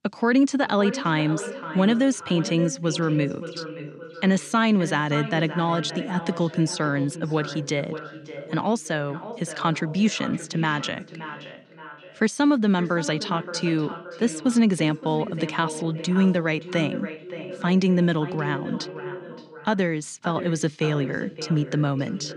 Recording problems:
echo of what is said; noticeable; throughout; 570 ms later, 10 dB below the speech

